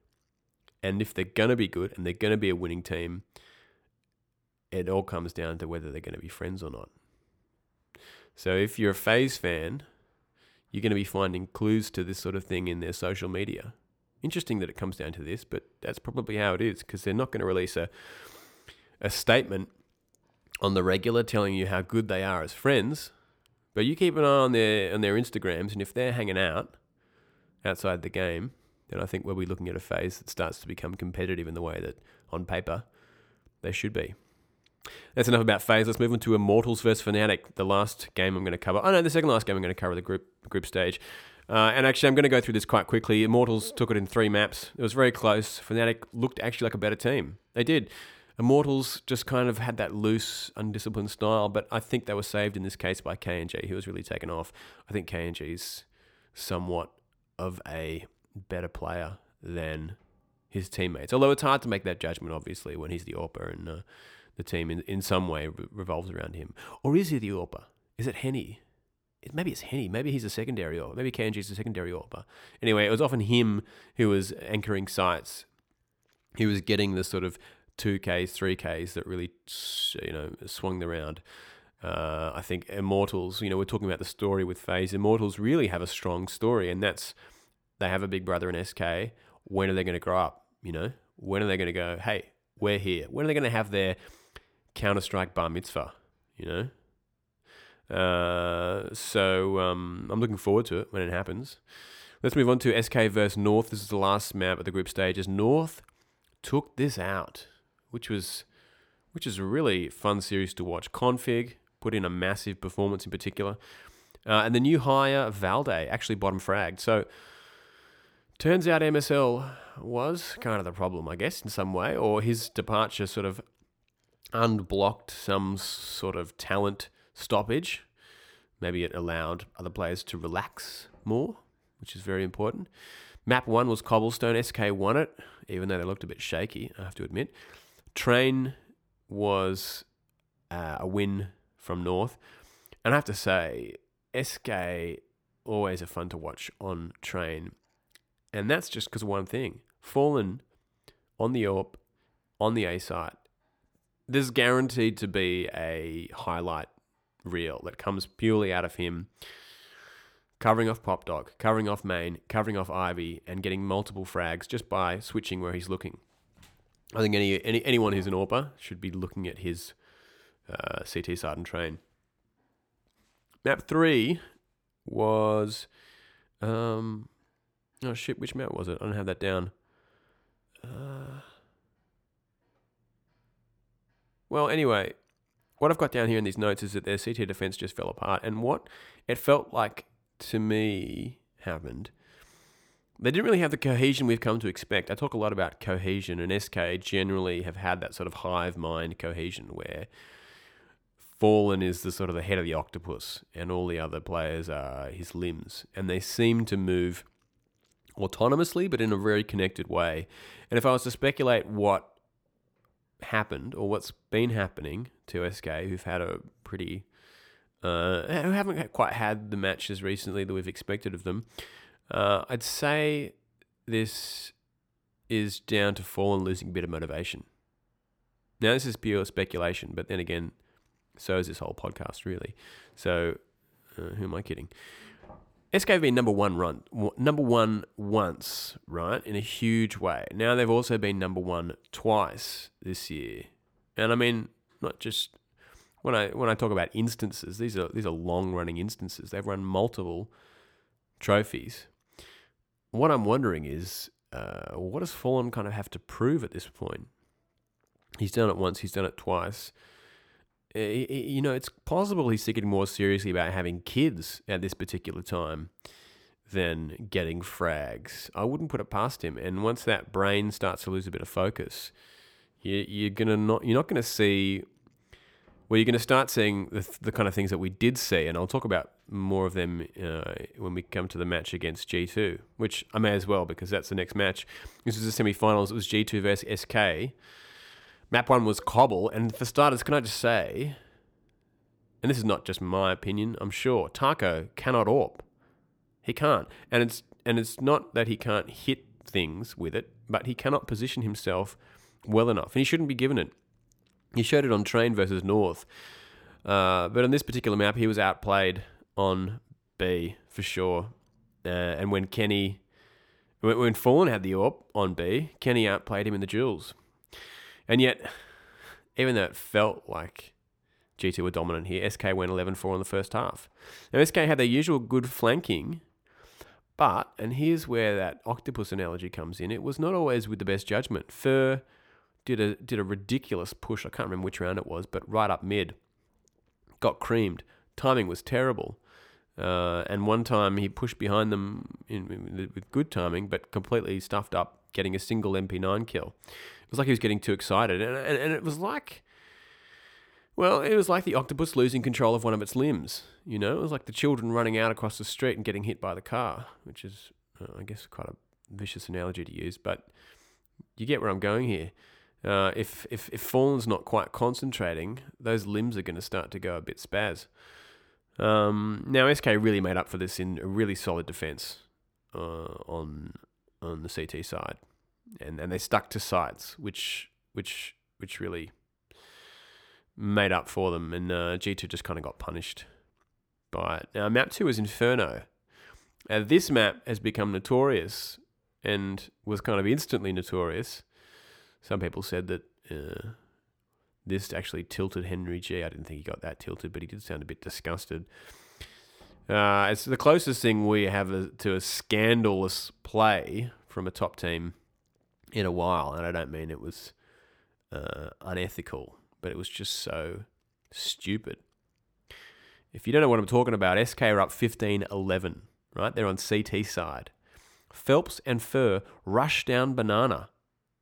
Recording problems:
none

